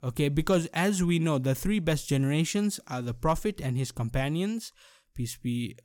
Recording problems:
none

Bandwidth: 17.5 kHz